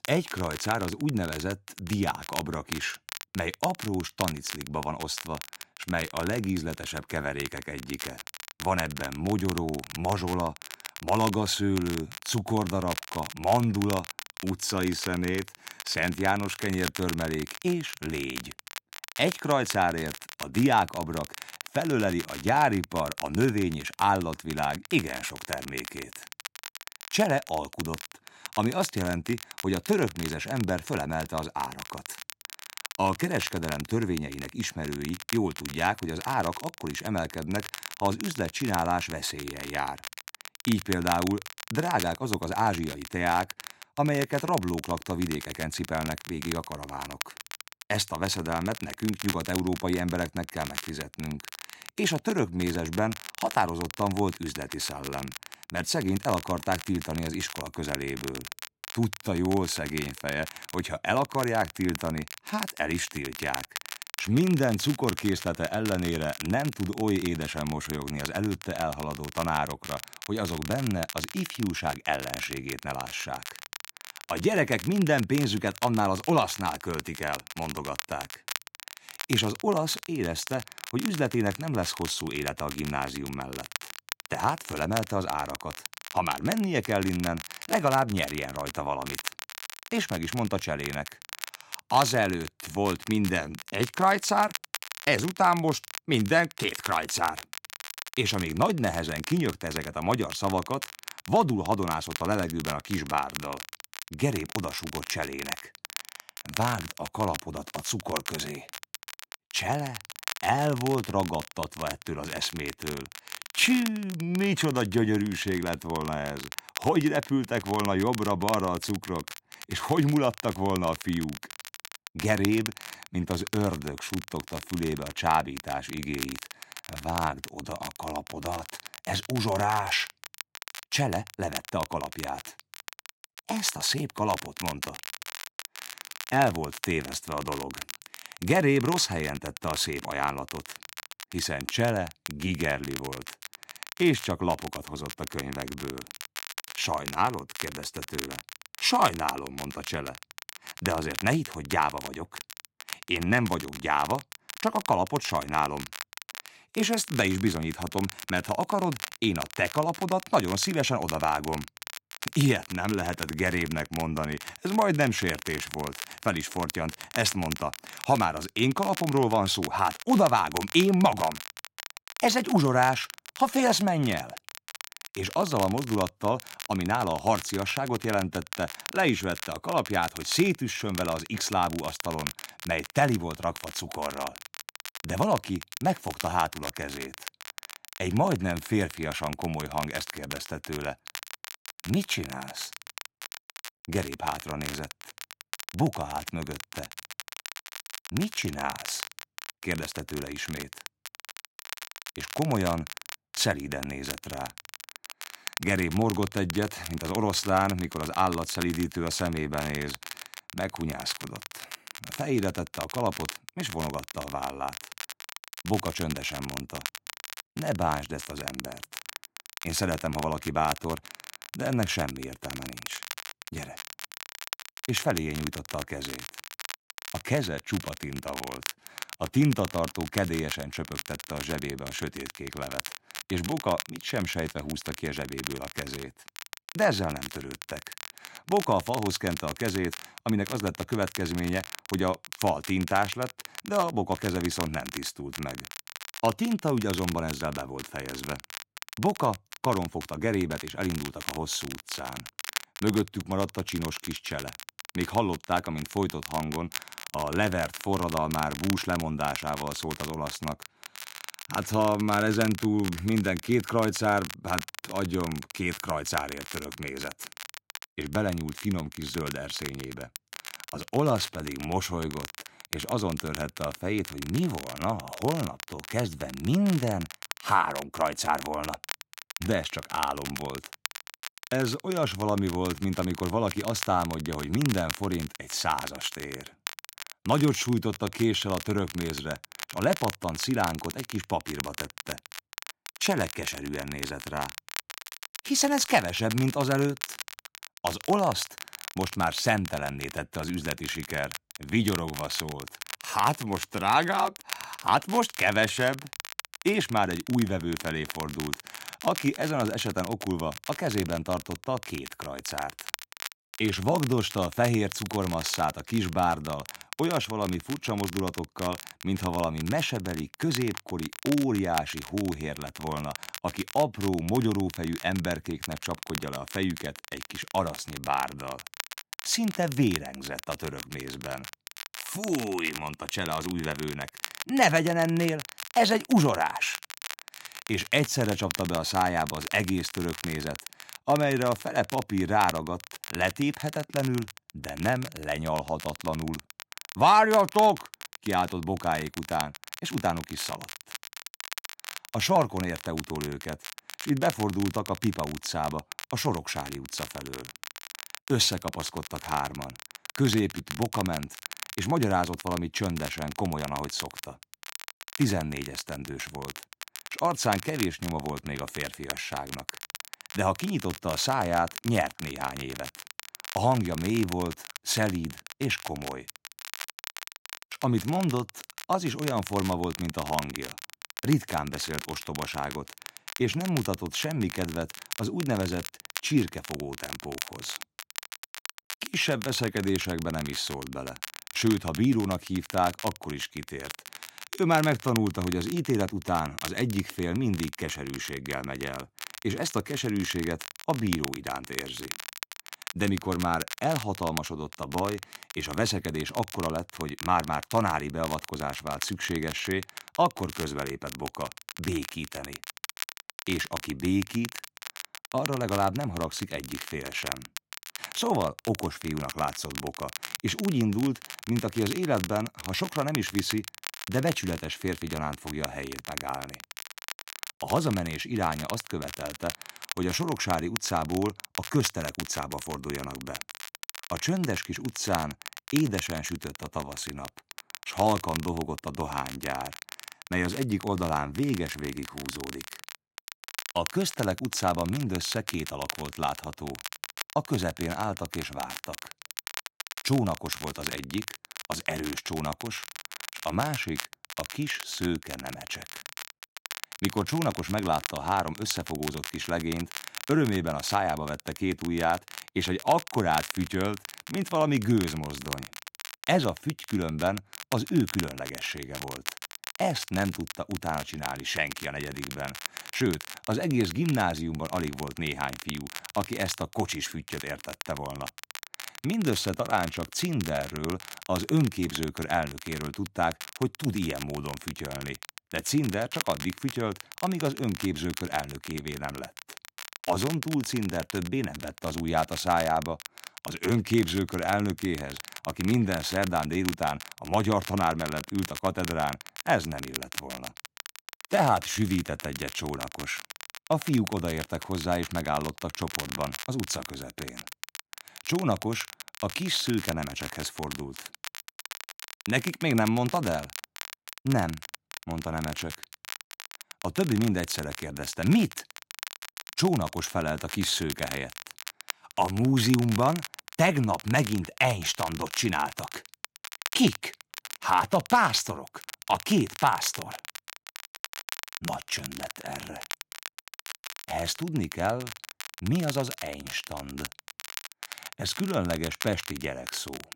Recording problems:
crackle, like an old record; noticeable; 10 dB below the speech

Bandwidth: 16 kHz